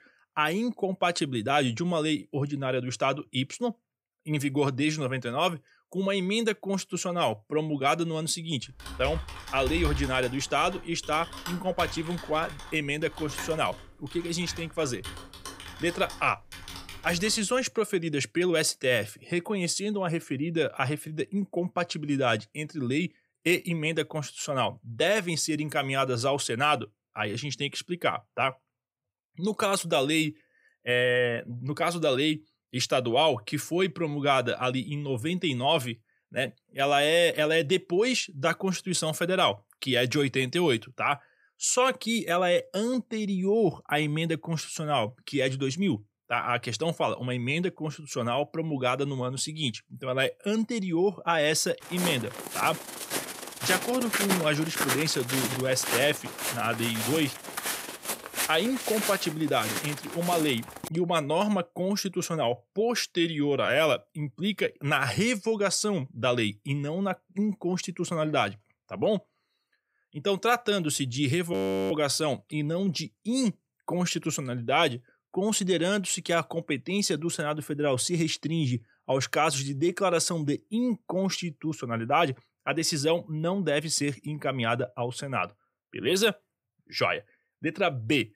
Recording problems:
keyboard typing; noticeable; from 9 to 17 s; peak 4 dB below the speech
footsteps; loud; from 52 s to 1:01; peak 1 dB above the speech
audio freezing; at 1:12

